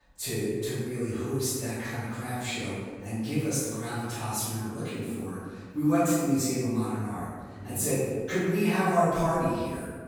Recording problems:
room echo; strong; dies away in 1.4 s
off-mic speech; far

